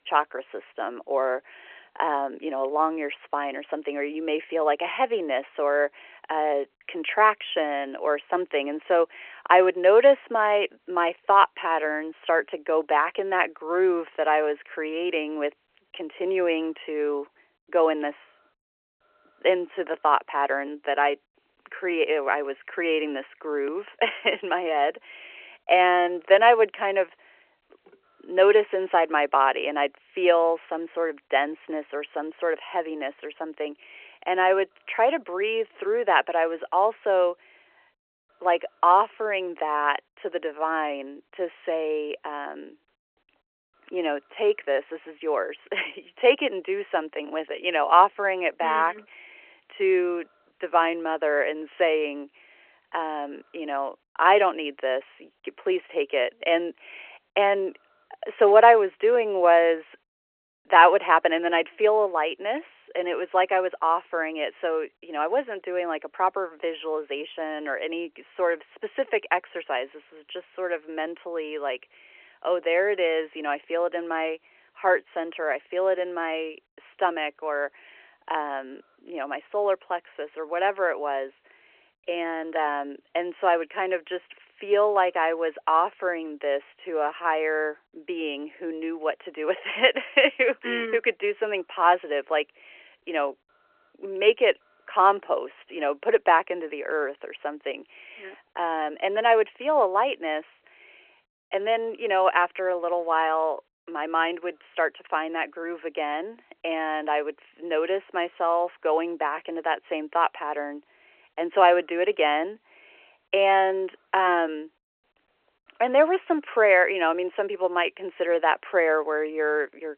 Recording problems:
phone-call audio

